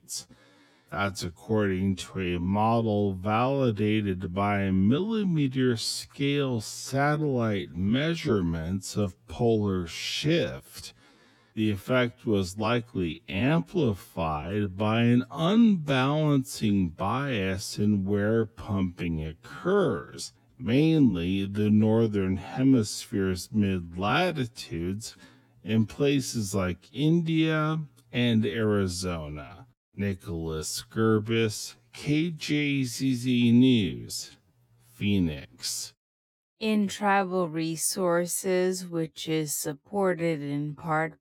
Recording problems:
wrong speed, natural pitch; too slow; 0.5 times normal speed

